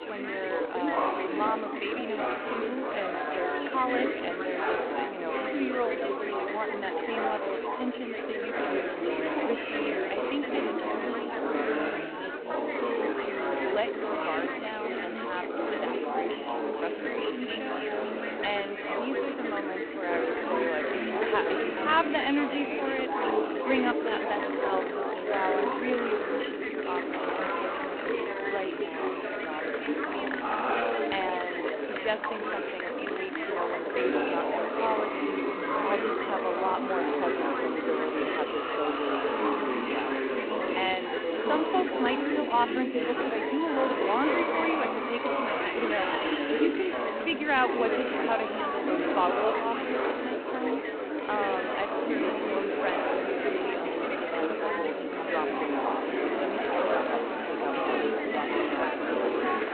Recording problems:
phone-call audio; poor line; nothing above 4 kHz
murmuring crowd; very loud; throughout; 4 dB above the speech
traffic noise; noticeable; throughout; 20 dB below the speech

